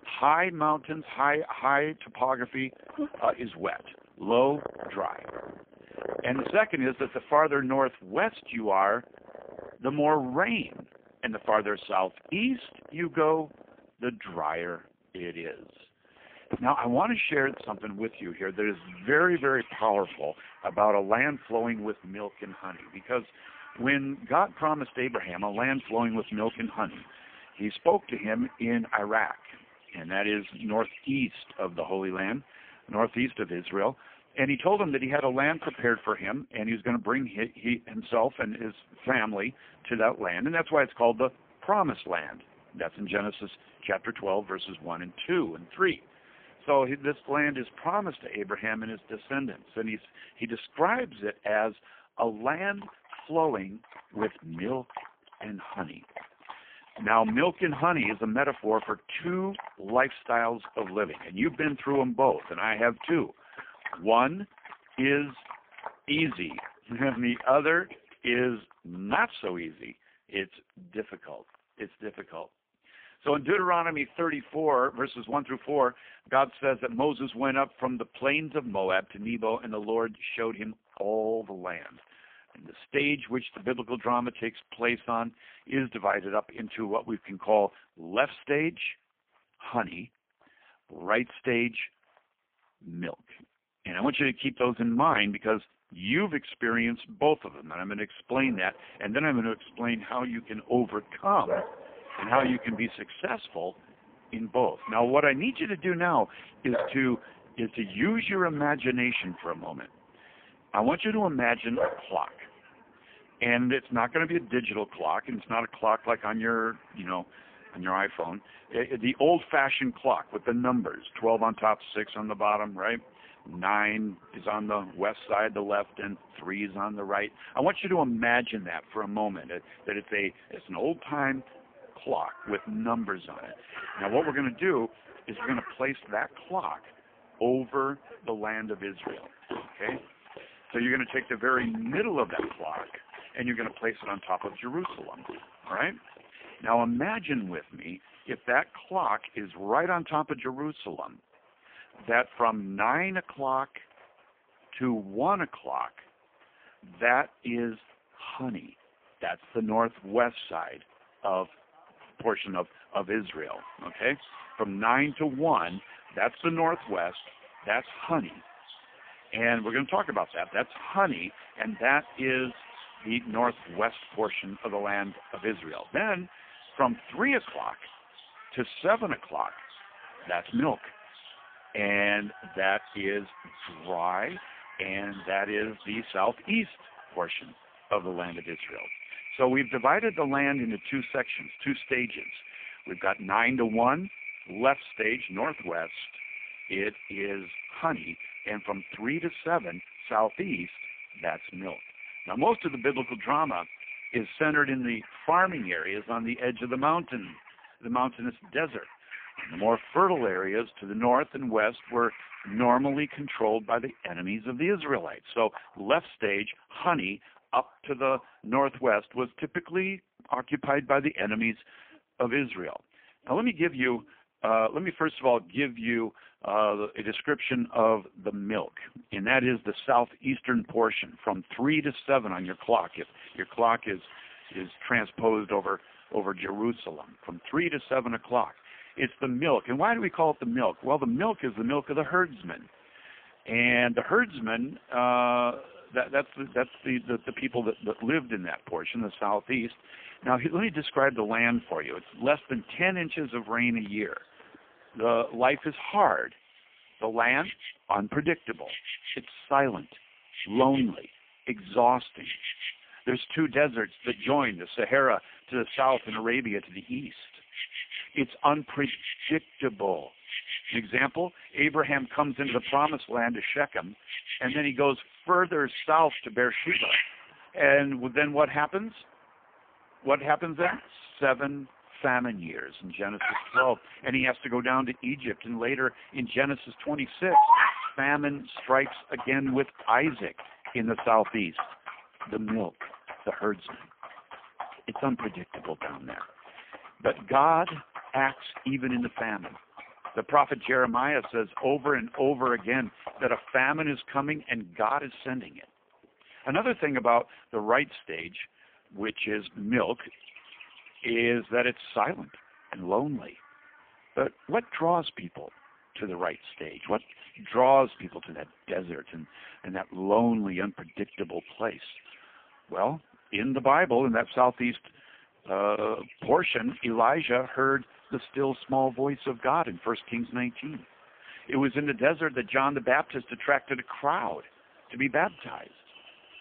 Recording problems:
phone-call audio; poor line
animal sounds; loud; throughout; 9 dB below the speech

